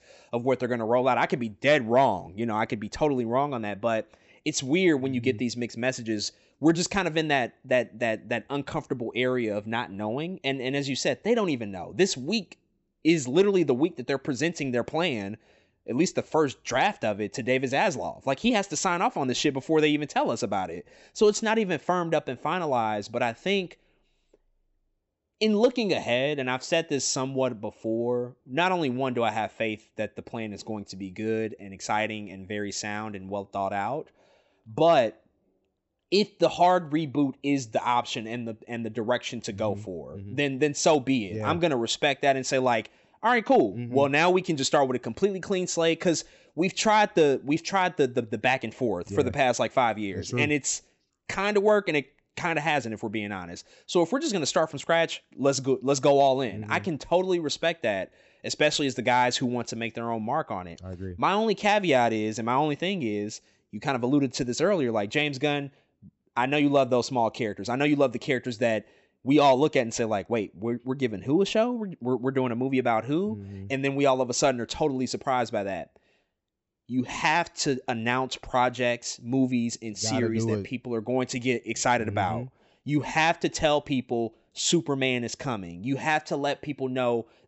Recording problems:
high frequencies cut off; noticeable; nothing above 7.5 kHz

